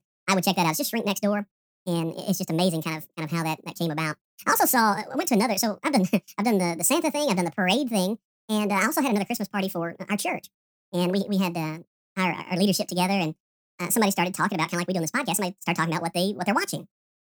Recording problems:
wrong speed and pitch; too fast and too high; 1.6 times normal speed

